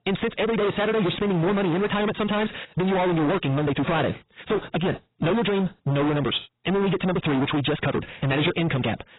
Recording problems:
distortion; heavy; 32% of the sound clipped
garbled, watery; badly; nothing above 4 kHz
wrong speed, natural pitch; too fast; 1.7 times normal speed

